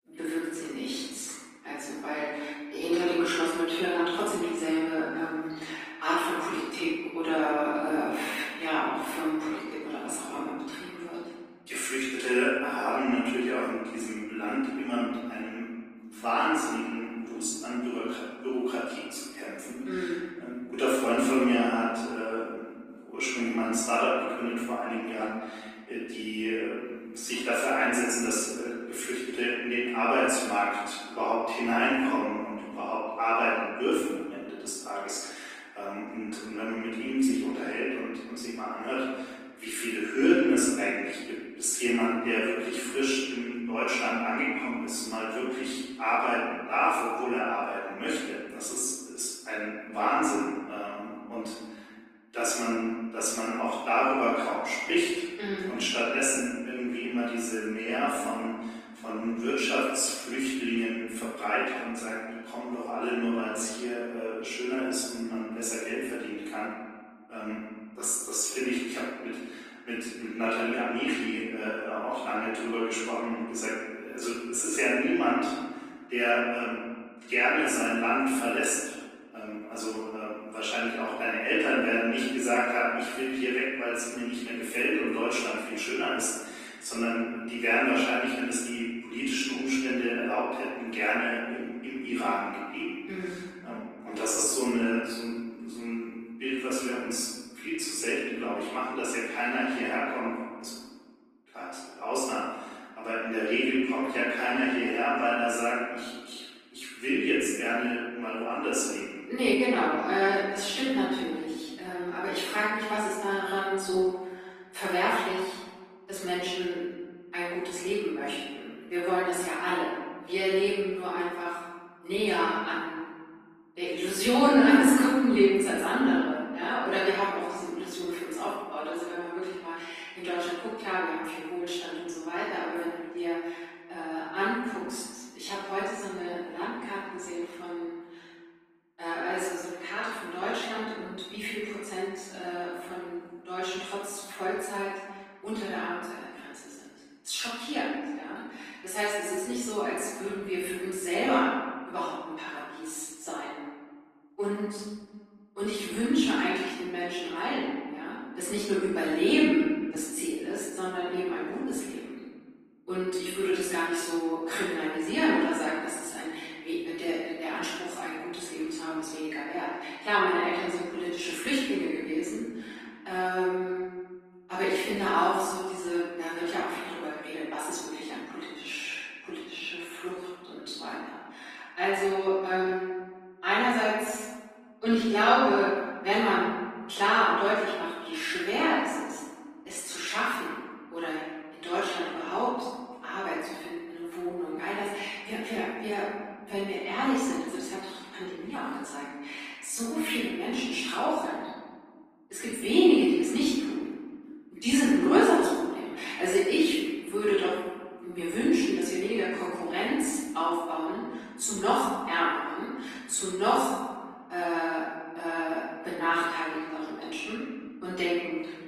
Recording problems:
room echo; strong; dies away in 1.5 s
off-mic speech; far
garbled, watery; slightly
thin; very slightly; fading below 250 Hz

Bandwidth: 15 kHz